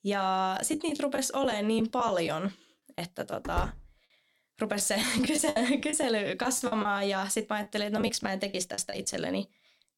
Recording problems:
choppy; very; from 0.5 to 3.5 s, from 5 to 7 s and from 7.5 to 9 s; 12% of the speech affected
door banging; noticeable; at 3.5 s; peak 7 dB below the speech

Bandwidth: 17.5 kHz